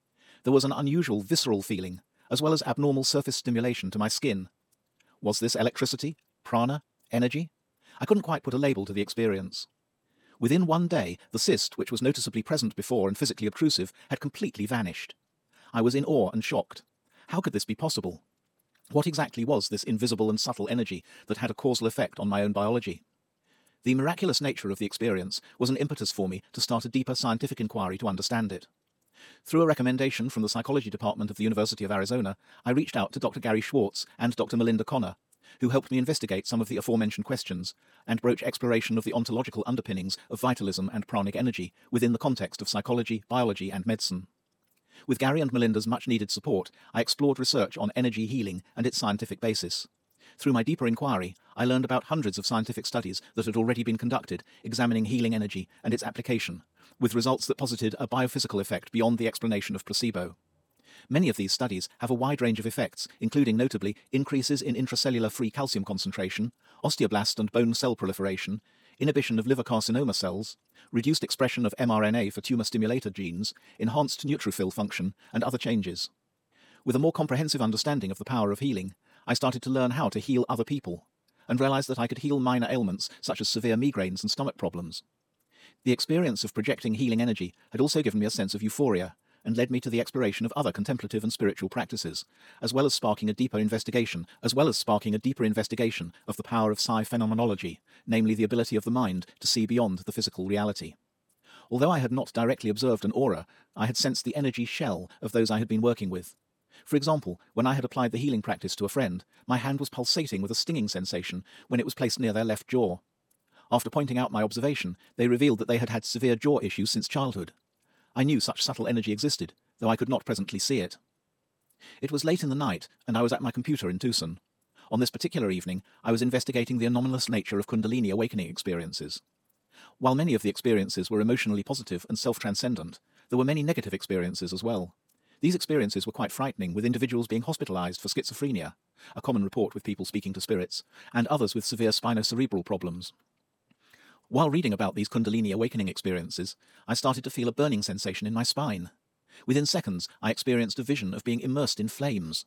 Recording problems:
wrong speed, natural pitch; too fast; 1.6 times normal speed

